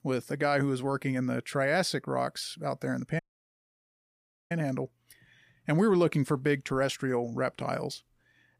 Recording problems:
audio cutting out; at 3 s for 1.5 s

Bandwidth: 15 kHz